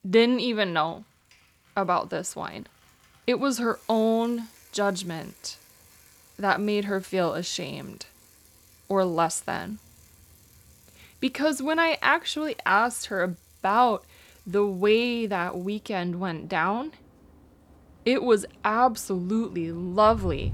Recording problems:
traffic noise; faint; throughout; 25 dB below the speech

